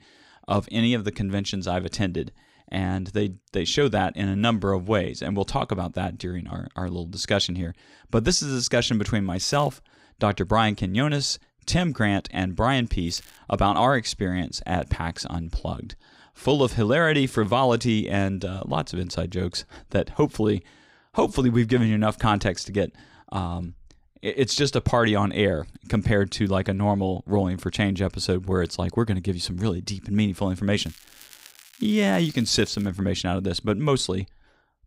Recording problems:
crackling; faint; at 9.5 s, at 13 s and from 31 to 33 s; 25 dB below the speech

